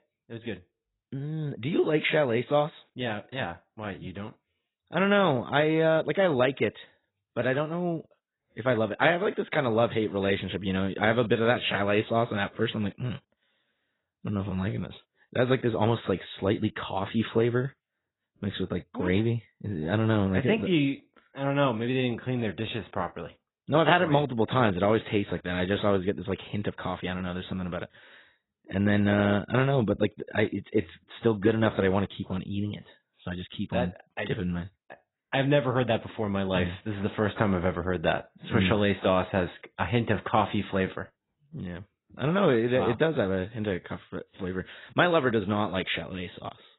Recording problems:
garbled, watery; badly; nothing above 4 kHz

